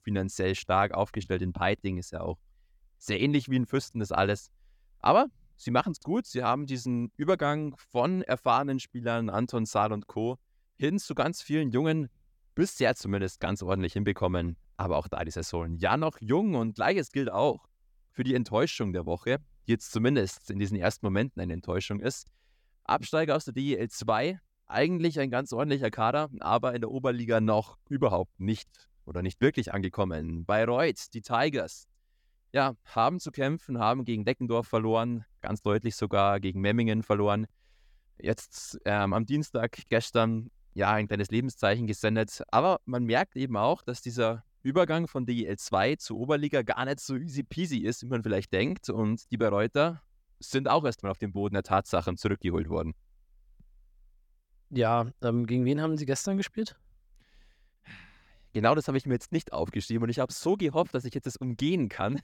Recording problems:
none

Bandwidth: 17.5 kHz